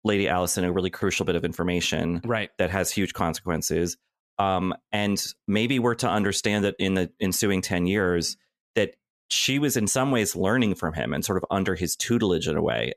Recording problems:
none

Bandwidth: 14 kHz